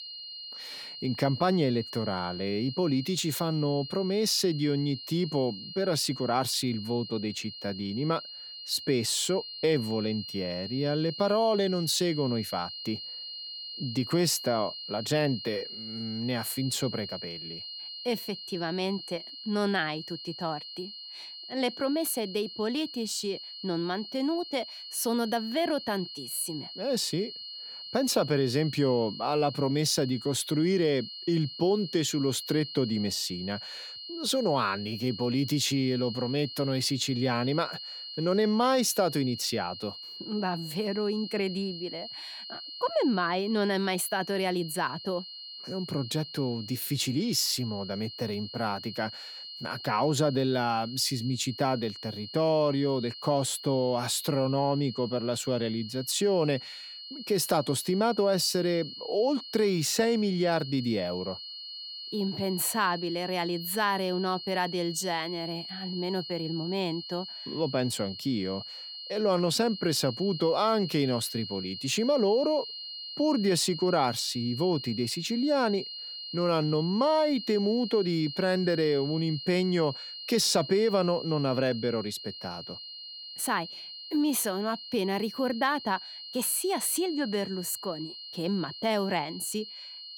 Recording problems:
high-pitched whine; loud; throughout; 4 kHz, 10 dB below the speech

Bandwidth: 18.5 kHz